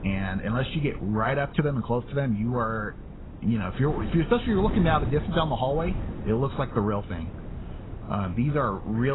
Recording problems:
garbled, watery; badly; nothing above 4 kHz
wind noise on the microphone; occasional gusts; 15 dB below the speech
abrupt cut into speech; at the end

